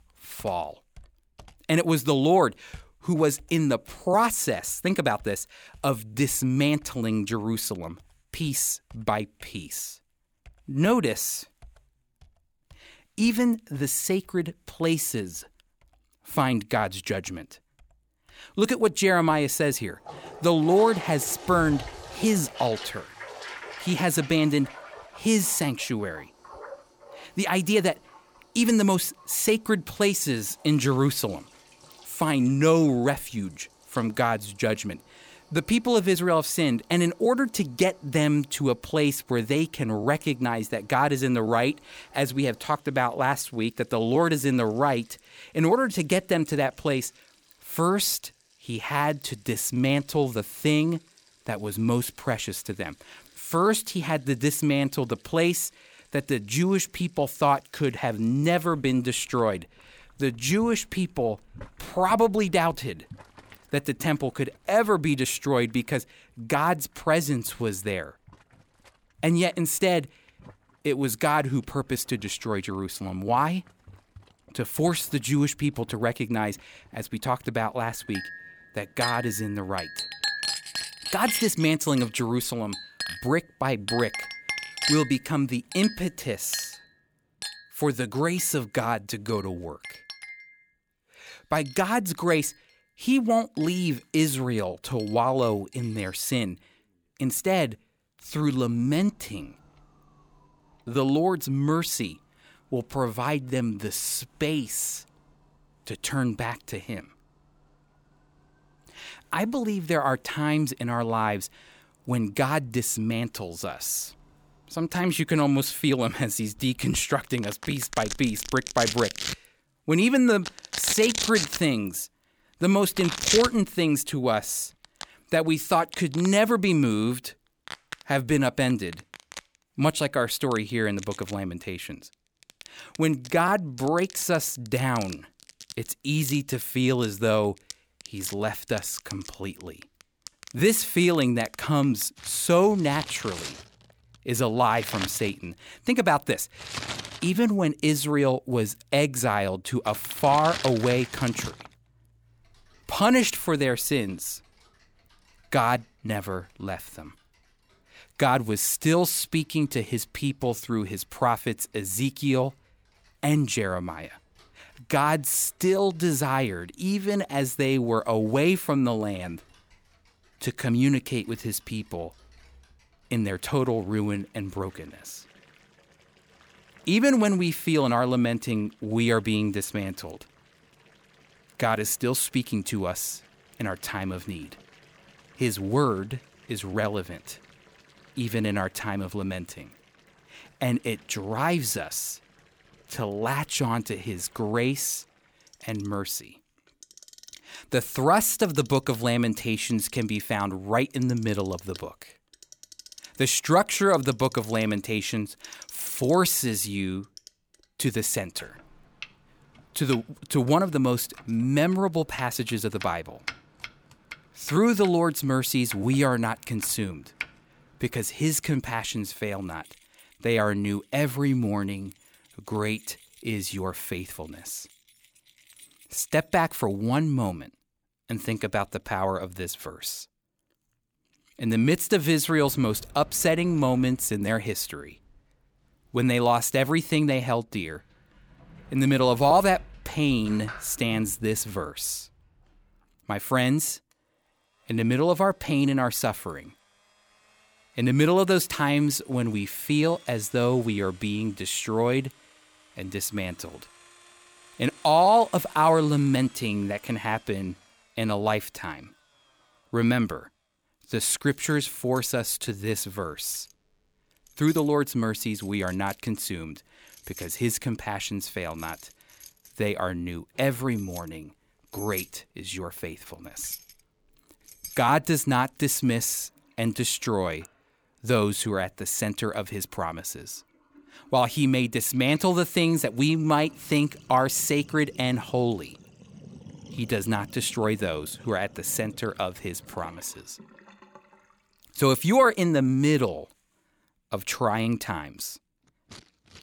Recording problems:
household noises; noticeable; throughout; 15 dB below the speech

